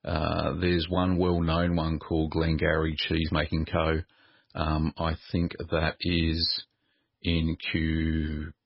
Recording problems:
garbled, watery; badly; nothing above 5 kHz

